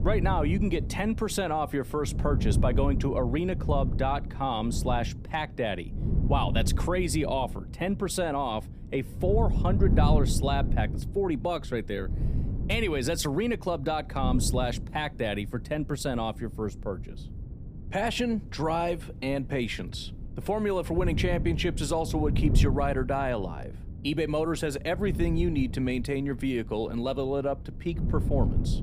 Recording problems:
wind noise on the microphone; occasional gusts; 15 dB below the speech

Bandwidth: 15 kHz